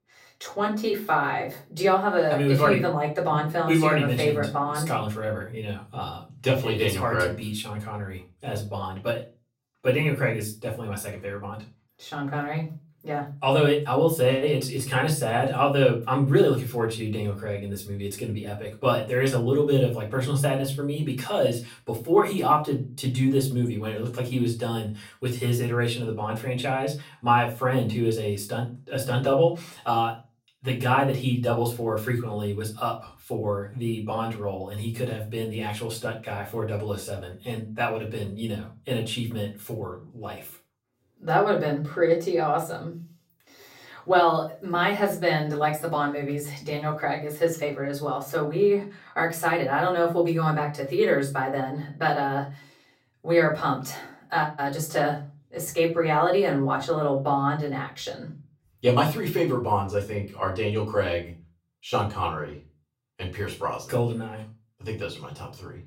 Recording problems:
off-mic speech; far
room echo; very slight; dies away in 0.3 s

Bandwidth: 16 kHz